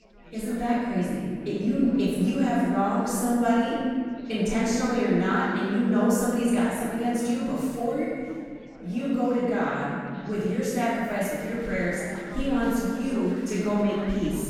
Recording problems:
room echo; strong; dies away in 2 s
off-mic speech; far
chatter from many people; faint; throughout; 20 dB below the speech

